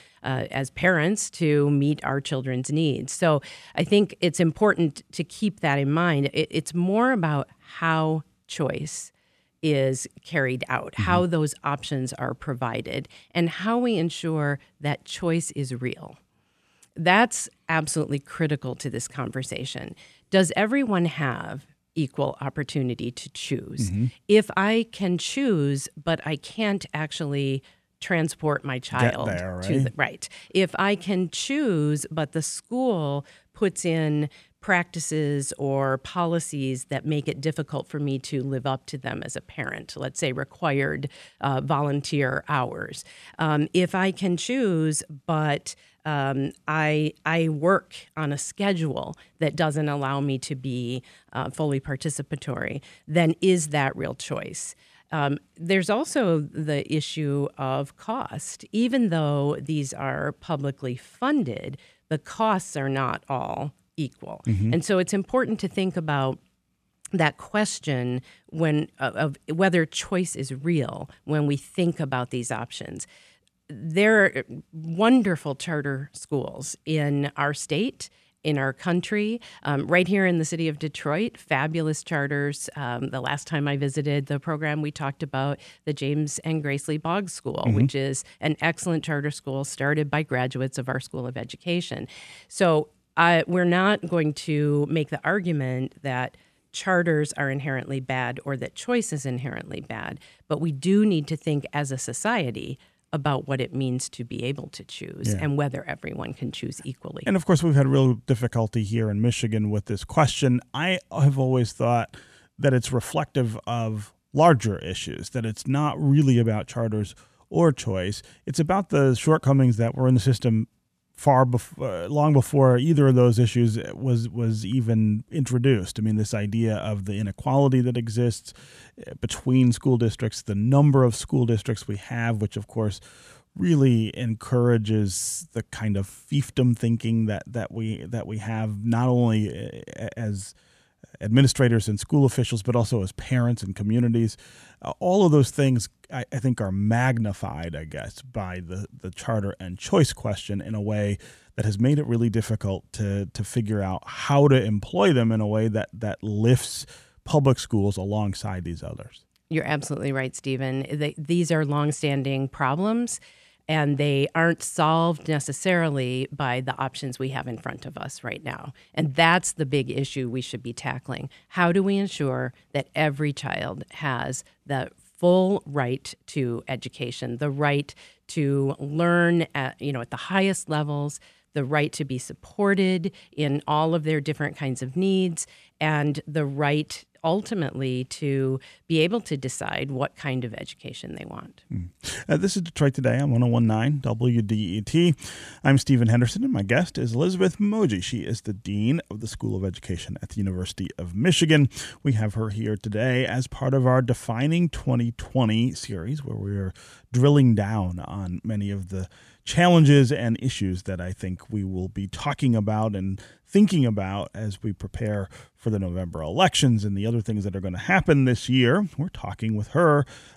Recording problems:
none

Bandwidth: 14.5 kHz